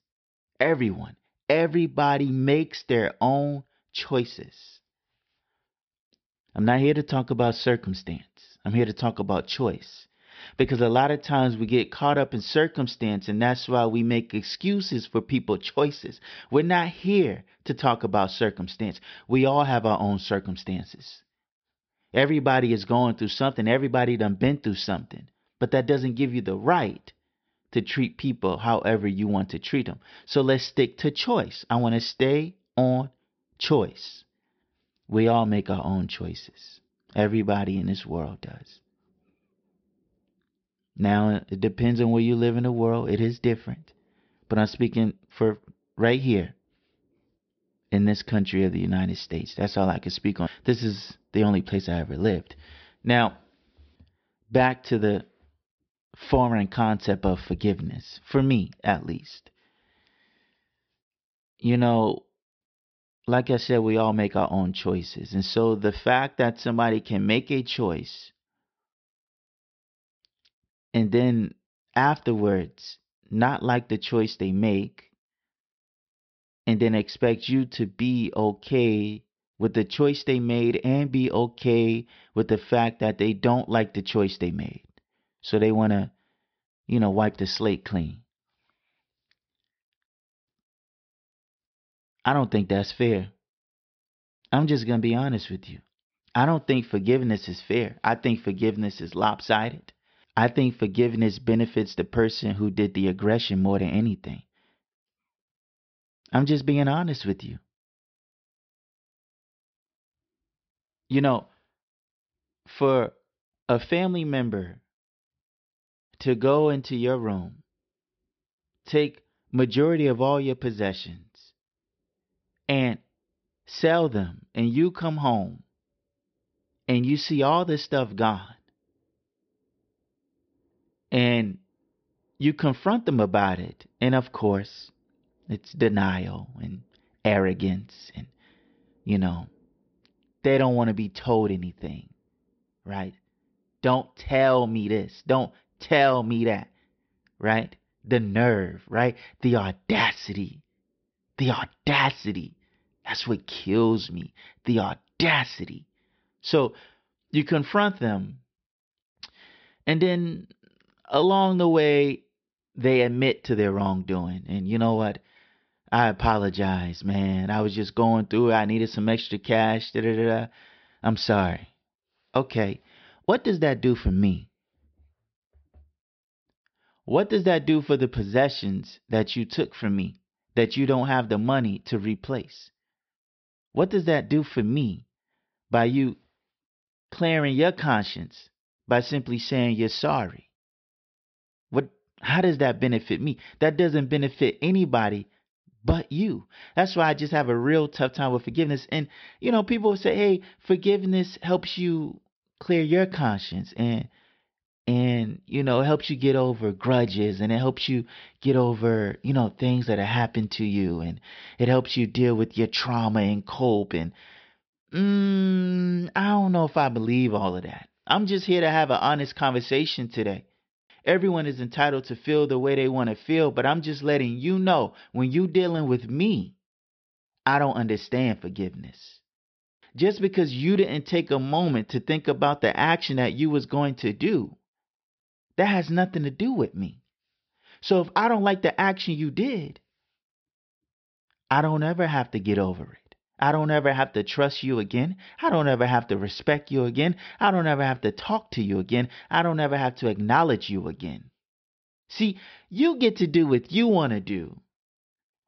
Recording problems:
high frequencies cut off; noticeable; nothing above 5.5 kHz

